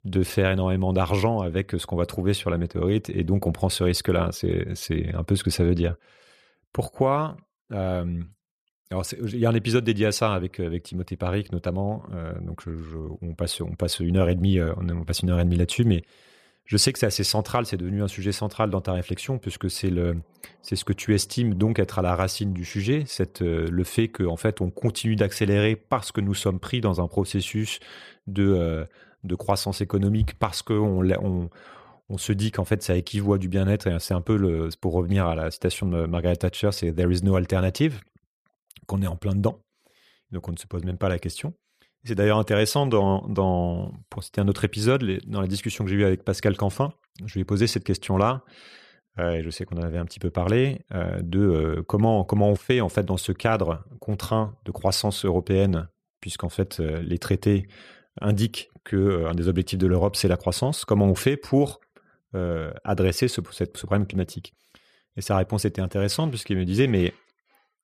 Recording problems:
none

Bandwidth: 14.5 kHz